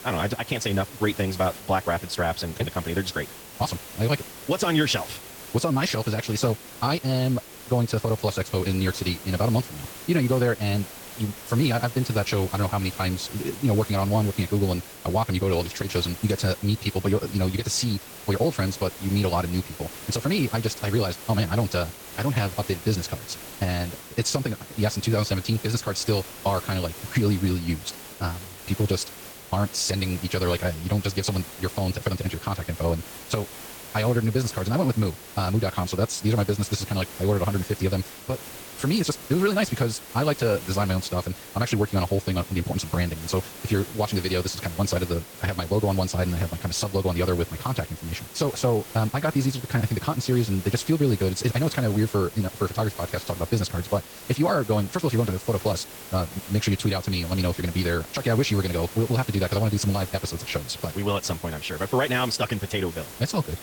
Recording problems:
wrong speed, natural pitch; too fast; 1.6 times normal speed
garbled, watery; slightly; nothing above 18.5 kHz
hiss; noticeable; throughout; 15 dB below the speech

